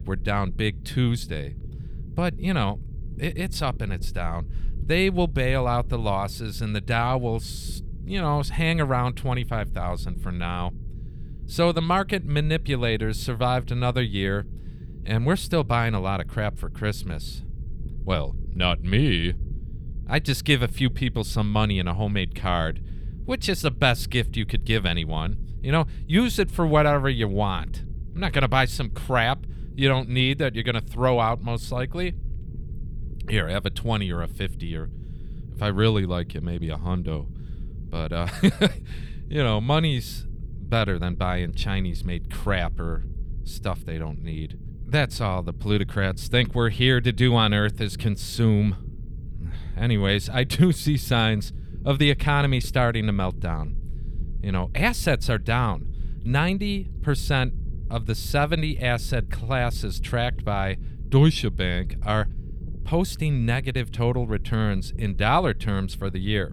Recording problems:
low rumble; faint; throughout; 25 dB below the speech

